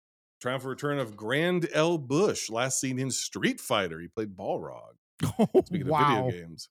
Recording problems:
none

